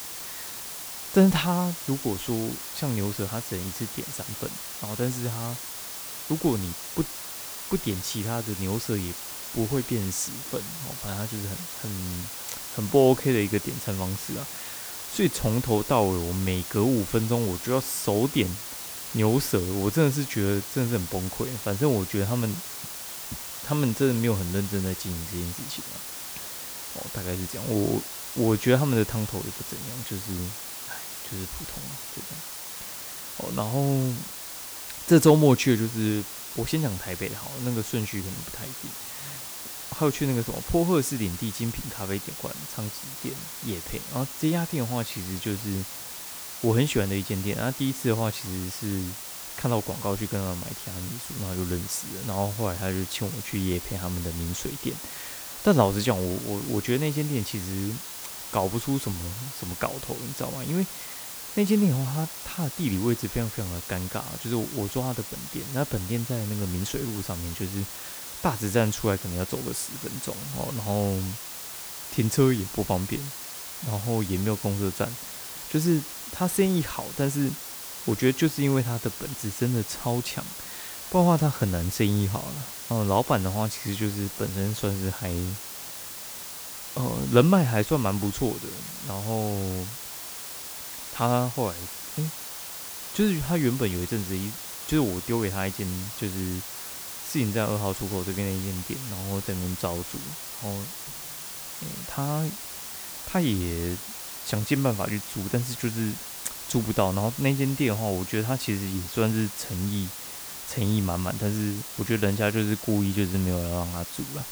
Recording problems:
hiss; loud; throughout; 7 dB below the speech

